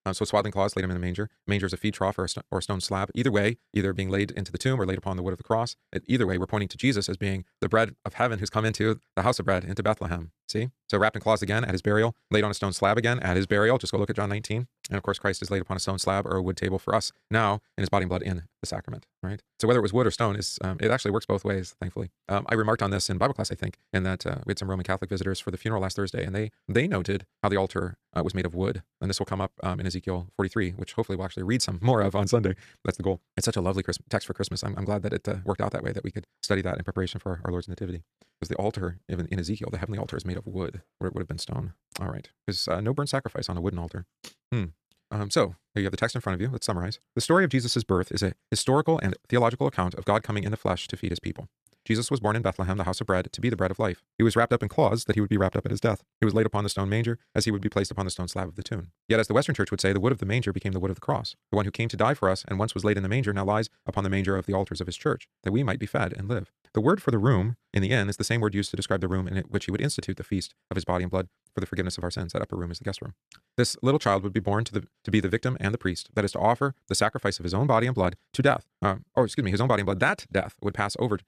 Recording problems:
wrong speed, natural pitch; too fast; 1.5 times normal speed

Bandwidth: 14 kHz